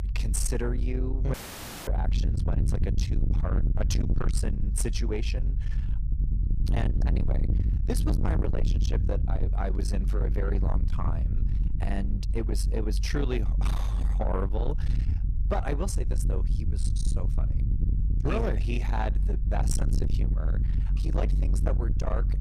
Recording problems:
distortion; heavy; 7 dB below the speech
low rumble; loud; throughout; 7 dB below the speech
audio cutting out; filled with static; at 1.5 s for 0.5 s

